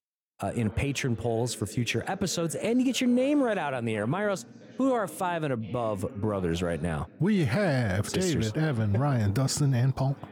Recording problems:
voice in the background; noticeable; throughout; 20 dB below the speech

